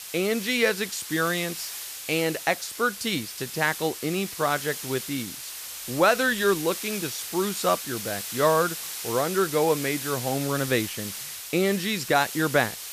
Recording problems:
hiss; loud; throughout; 7 dB below the speech

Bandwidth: 14.5 kHz